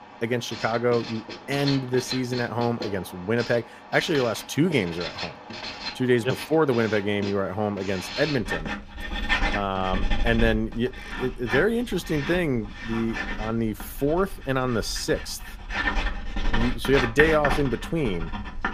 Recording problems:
household noises; loud; throughout; 6 dB below the speech

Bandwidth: 15 kHz